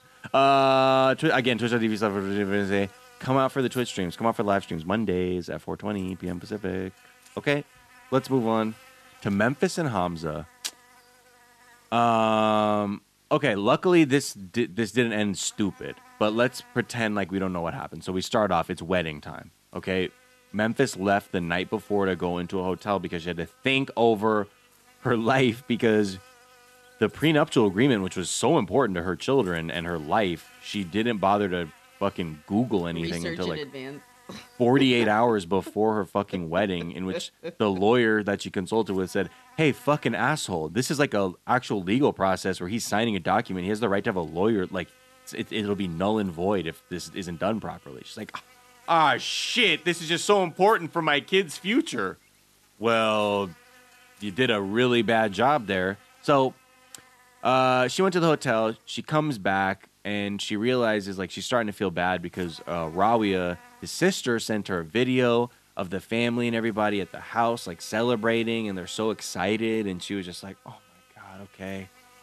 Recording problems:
electrical hum; faint; throughout; 50 Hz, 30 dB below the speech

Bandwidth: 13.5 kHz